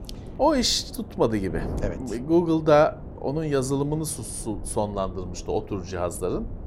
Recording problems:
wind noise on the microphone; occasional gusts; 20 dB below the speech

